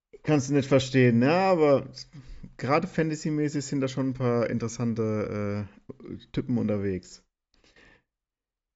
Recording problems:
high frequencies cut off; noticeable; nothing above 8 kHz

